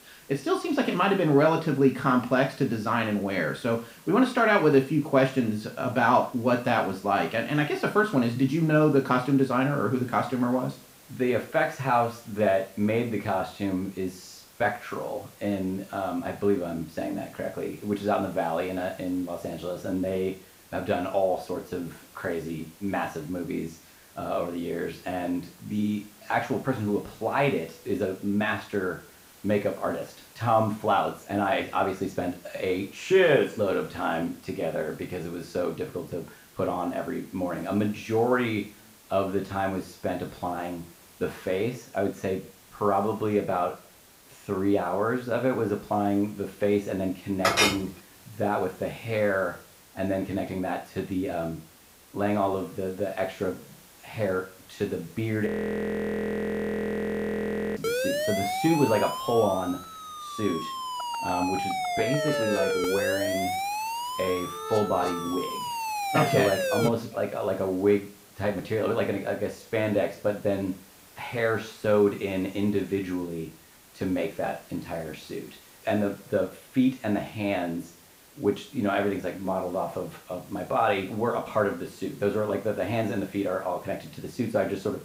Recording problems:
room echo; slight; dies away in 0.4 s
off-mic speech; somewhat distant
hiss; faint; throughout; 25 dB below the speech
clattering dishes; loud; at 47 s; peak 6 dB above the speech
audio freezing; at 55 s for 2.5 s
siren; loud; from 58 s to 1:07; peak 1 dB above the speech

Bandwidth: 15.5 kHz